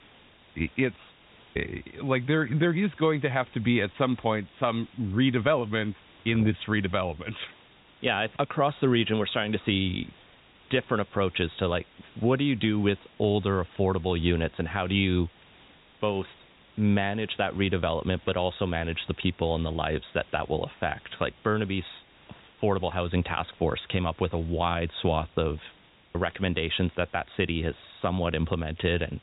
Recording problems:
high frequencies cut off; severe; nothing above 4 kHz
hiss; faint; throughout; 25 dB below the speech

